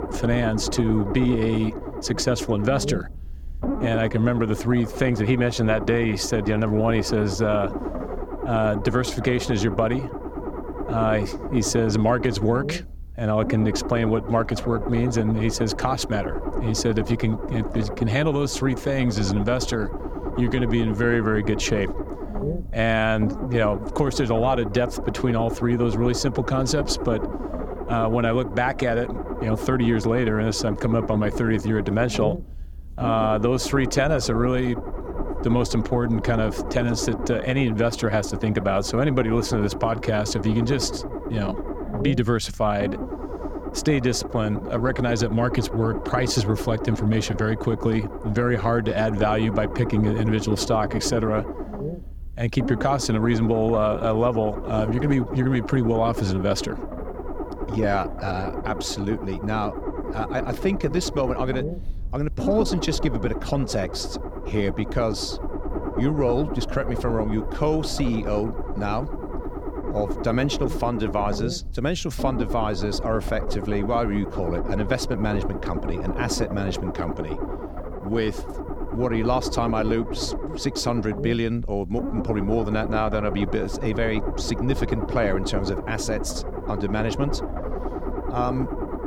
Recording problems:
low rumble; loud; throughout; 8 dB below the speech

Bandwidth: 18.5 kHz